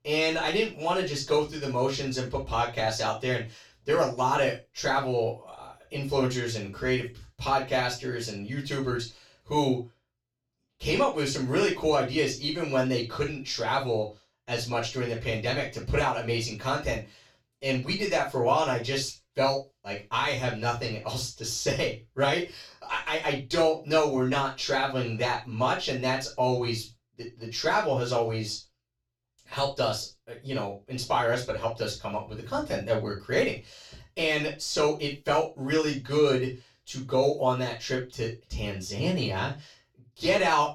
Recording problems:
off-mic speech; far
room echo; noticeable; dies away in 0.2 s

